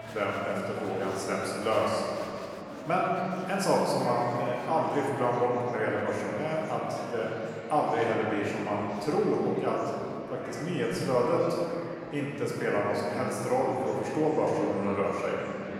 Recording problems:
room echo; strong; dies away in 2.3 s
off-mic speech; far
murmuring crowd; noticeable; throughout; 15 dB below the speech
background music; very faint; until 4 s; 25 dB below the speech

